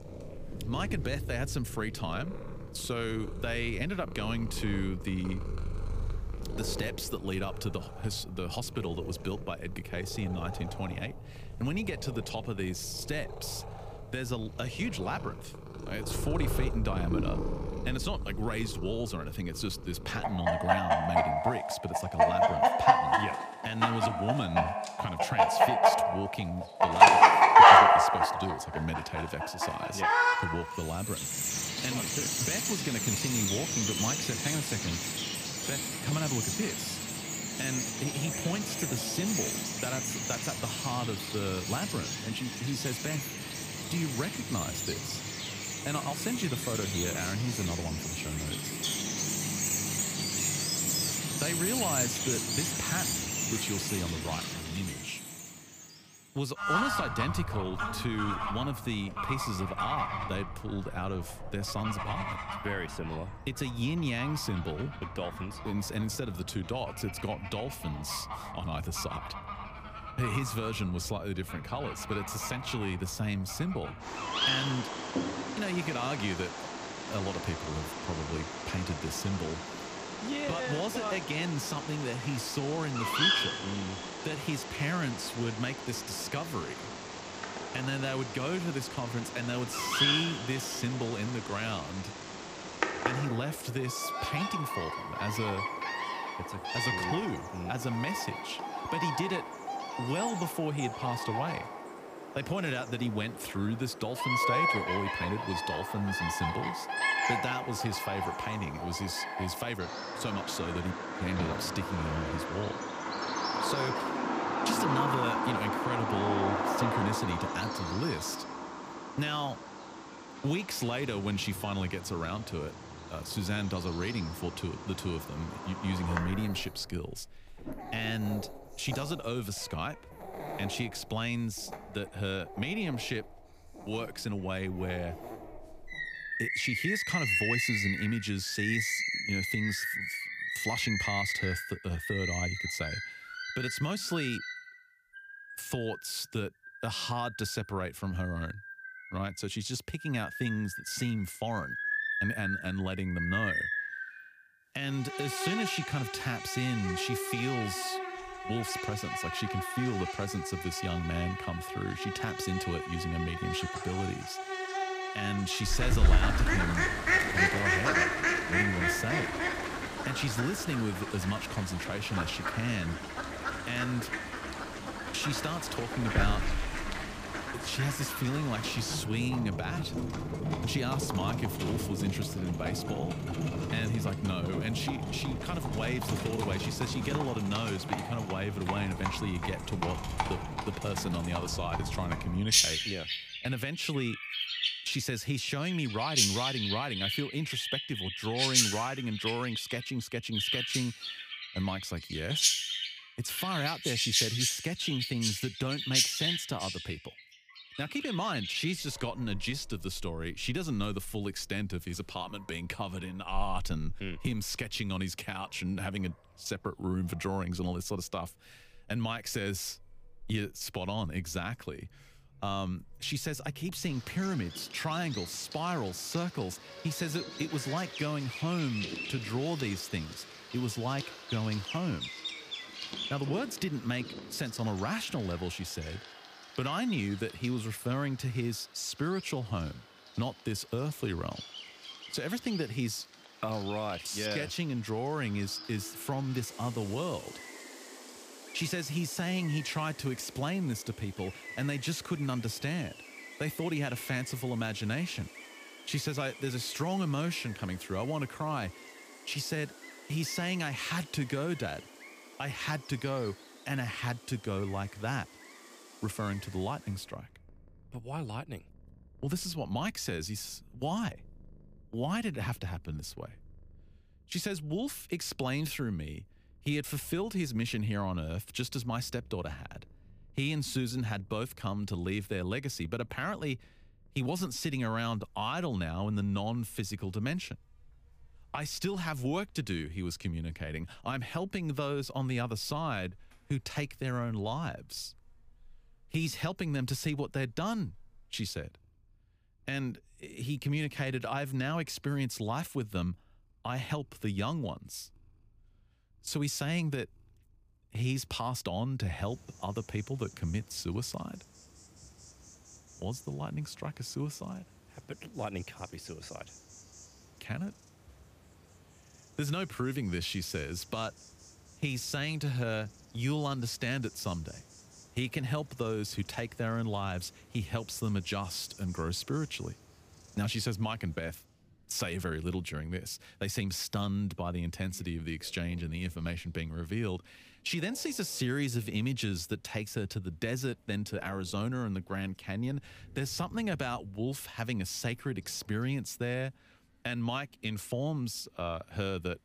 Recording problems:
animal sounds; very loud; throughout; 3 dB above the speech

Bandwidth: 15 kHz